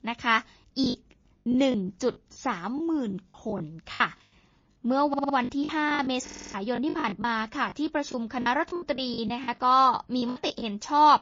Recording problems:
garbled, watery; slightly
choppy; very; 12% of the speech affected
audio stuttering; at 5 s and at 6 s

